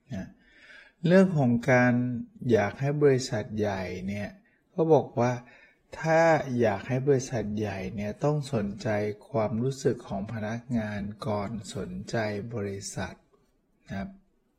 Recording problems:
wrong speed, natural pitch; too slow; 0.6 times normal speed
garbled, watery; slightly; nothing above 16 kHz

